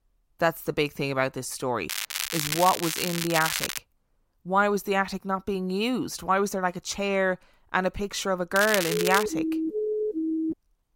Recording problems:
crackling; loud; from 2 to 4 s and at 8.5 s; 3 dB below the speech
siren; noticeable; from 9 s on; peak 1 dB below the speech

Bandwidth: 16 kHz